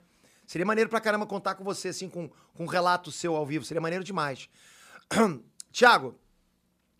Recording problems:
none

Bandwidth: 14.5 kHz